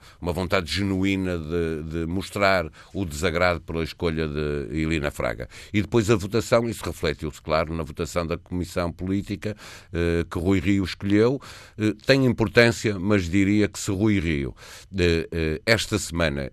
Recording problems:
none

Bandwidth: 13.5 kHz